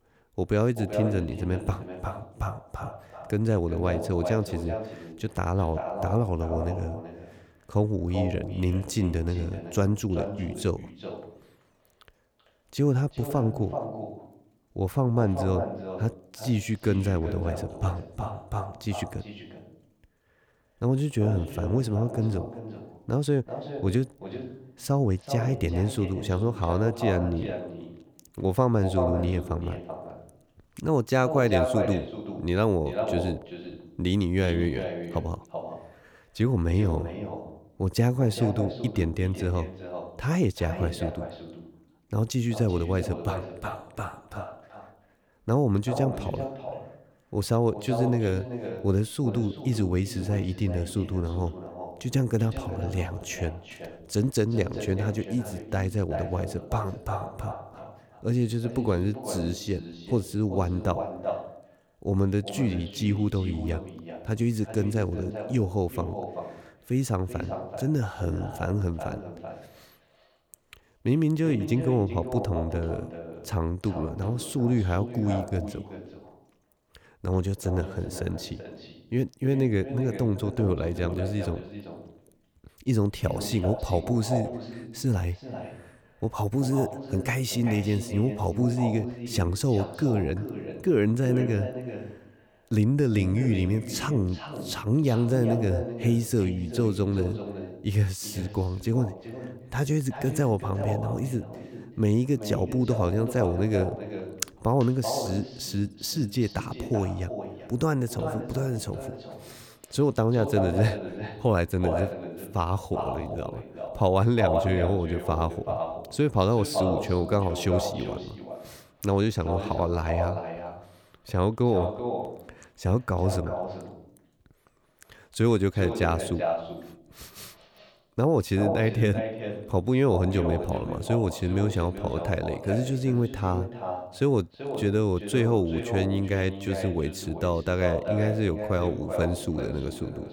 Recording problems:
echo of what is said; strong; throughout; 380 ms later, 8 dB below the speech

